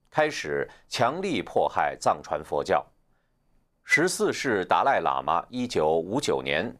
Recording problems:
none

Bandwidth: 14.5 kHz